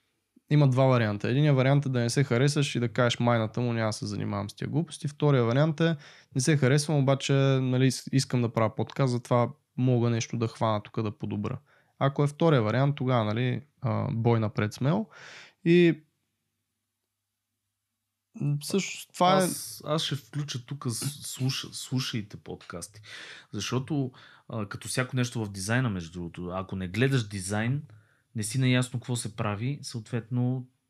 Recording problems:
none

